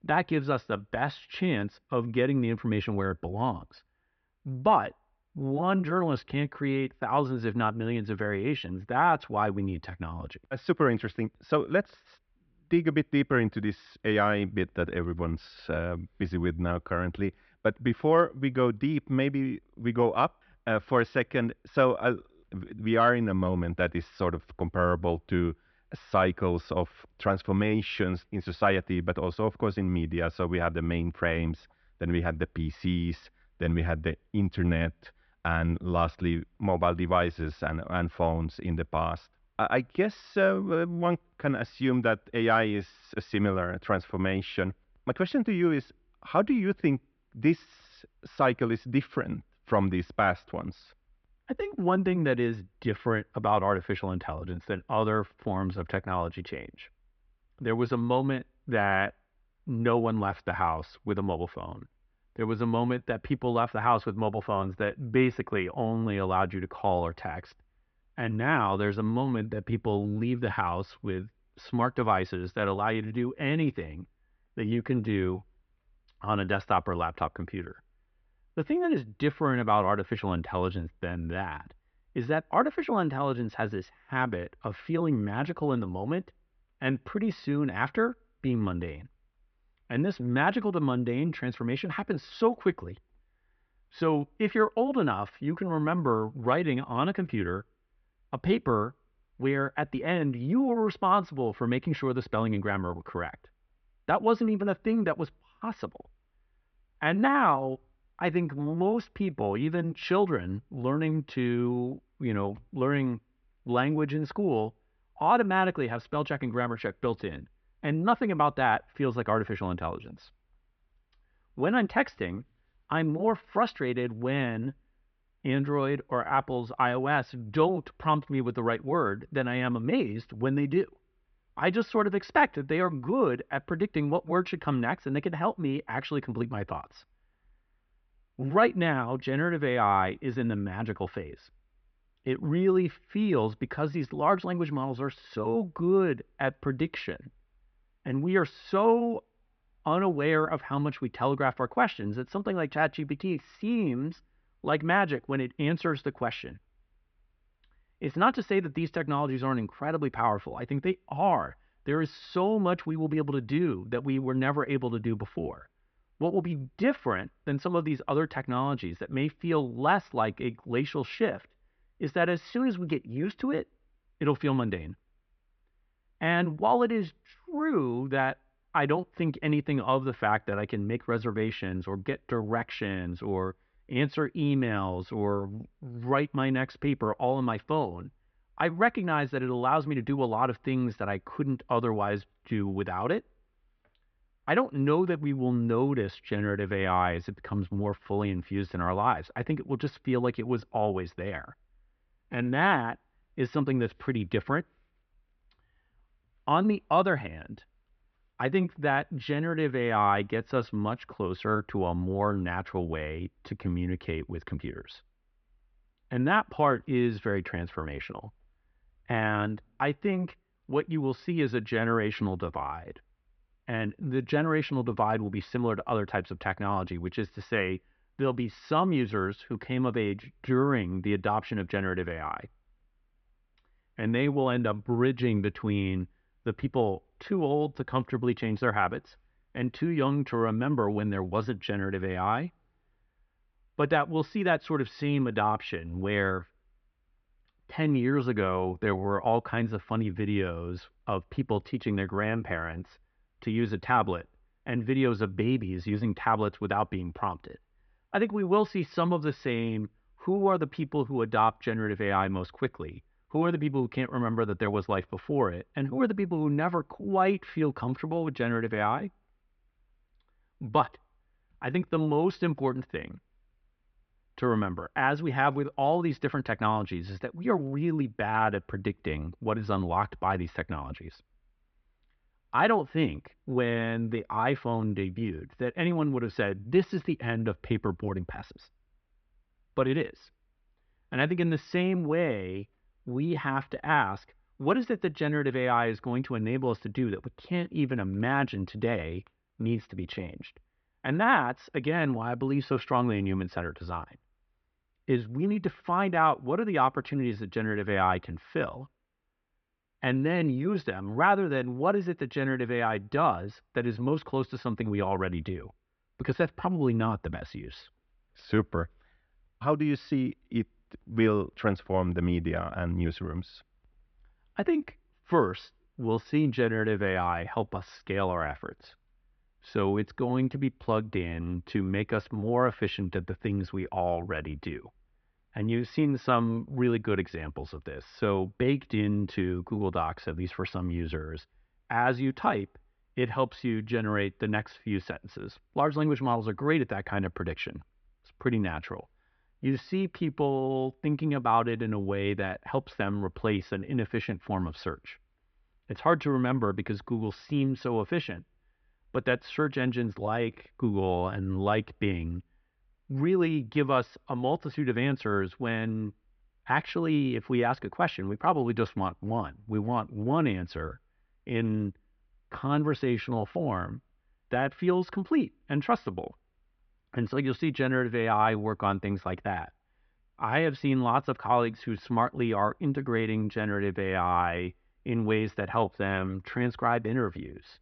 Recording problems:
muffled; very slightly; fading above 3.5 kHz
high frequencies cut off; slight; nothing above 6 kHz

